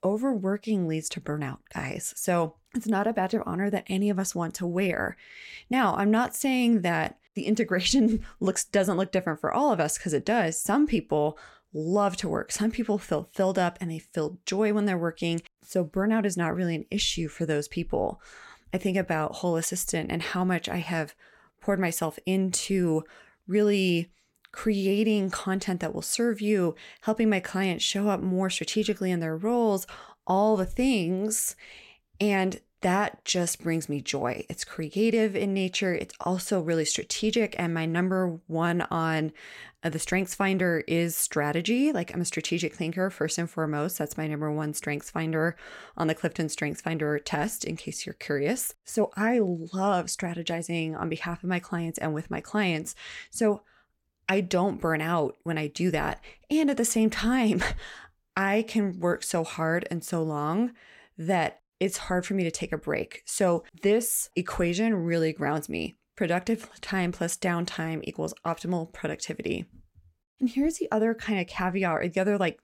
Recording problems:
none

